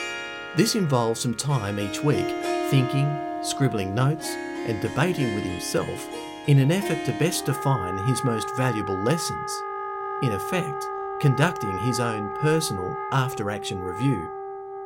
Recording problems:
background music; loud; throughout; 6 dB below the speech

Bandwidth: 16 kHz